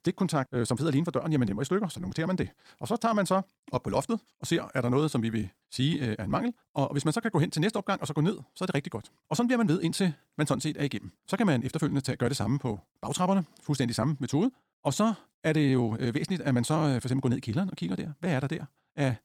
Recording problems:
wrong speed, natural pitch; too fast; 1.6 times normal speed

